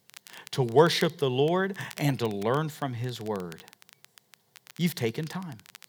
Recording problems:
crackle, like an old record; faint; 20 dB below the speech

